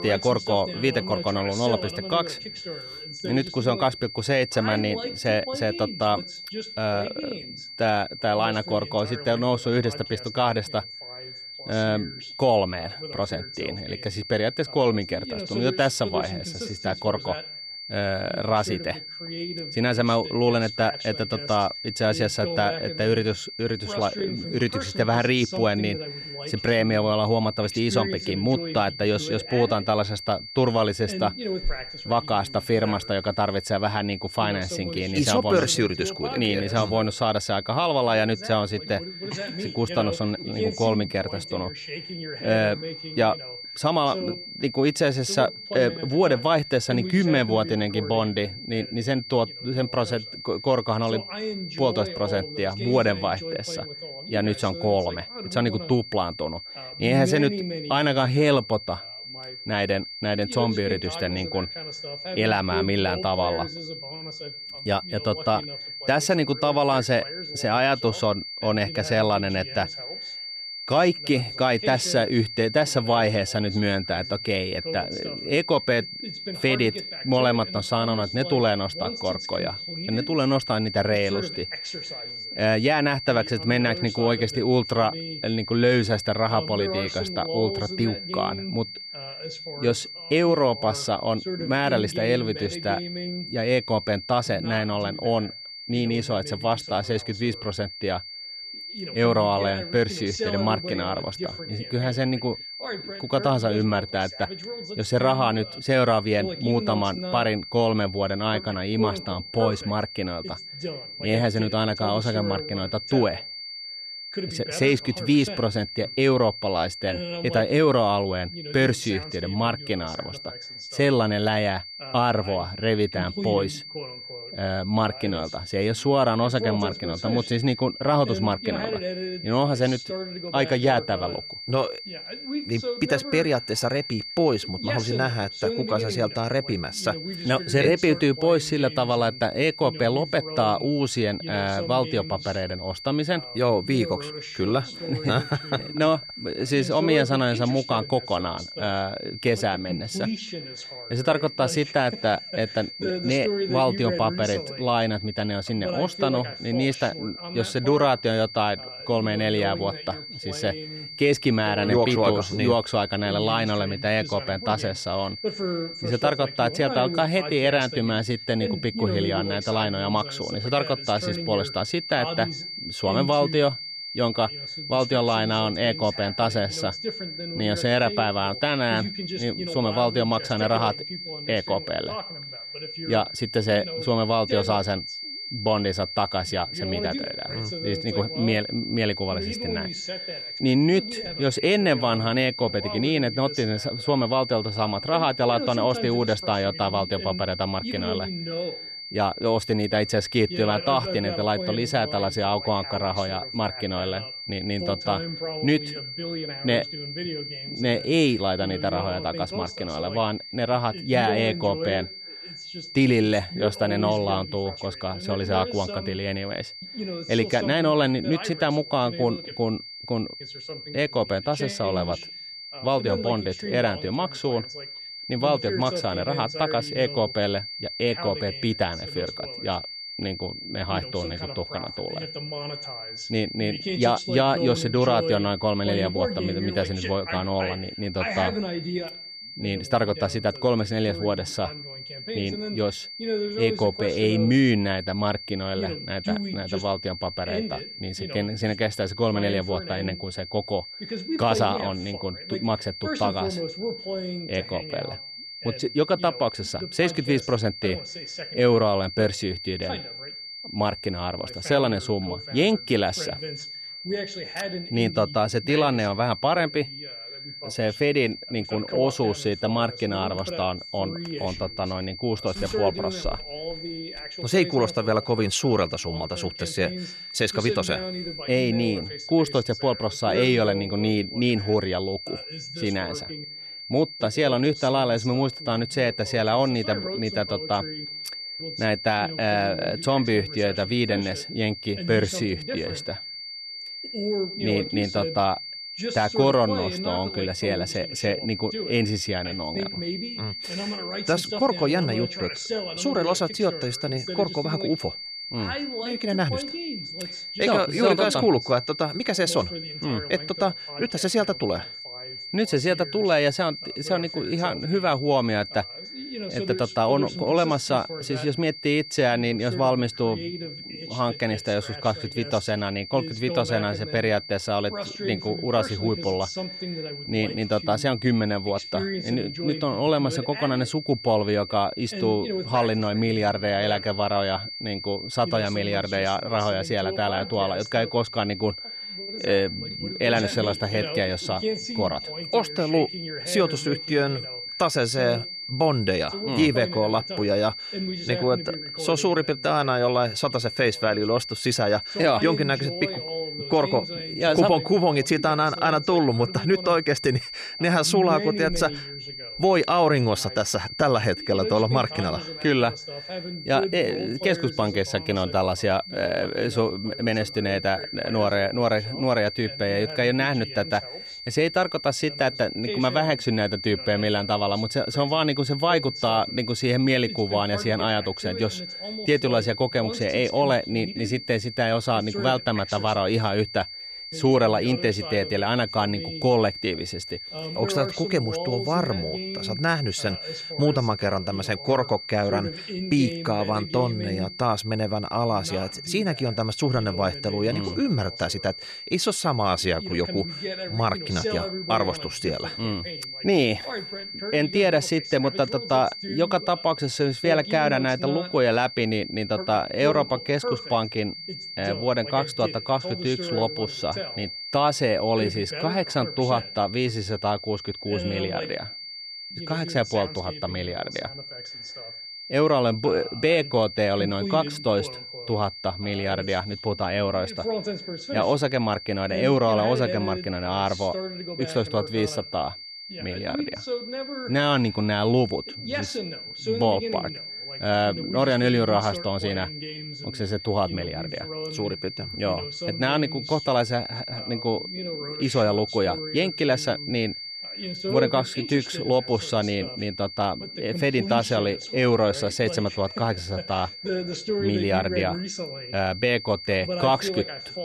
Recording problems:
high-pitched whine; loud; throughout; 4.5 kHz, 10 dB below the speech
voice in the background; noticeable; throughout; 10 dB below the speech

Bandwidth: 14 kHz